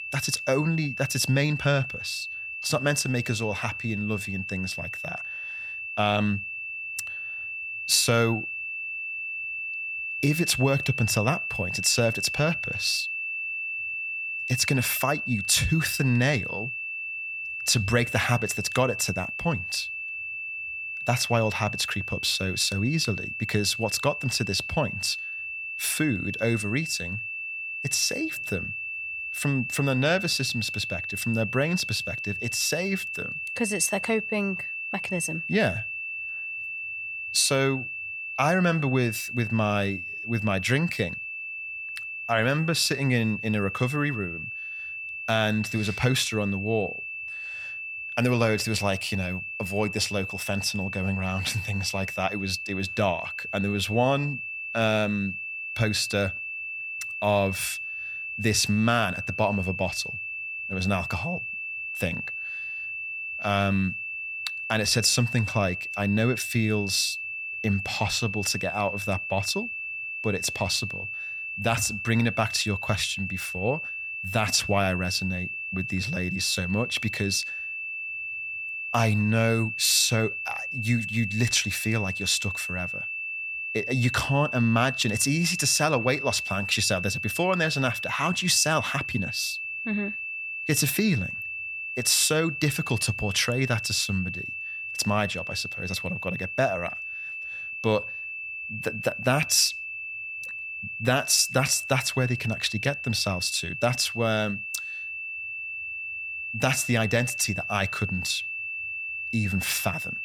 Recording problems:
high-pitched whine; loud; throughout; 2.5 kHz, 5 dB below the speech

